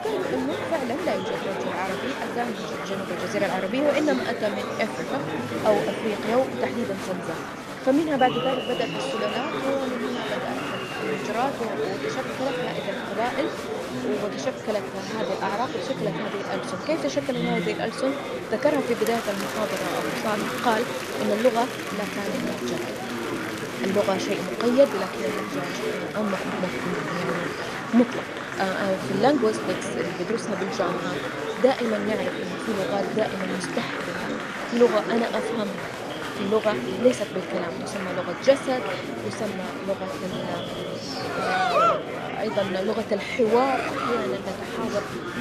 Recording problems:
murmuring crowd; loud; throughout; 2 dB below the speech

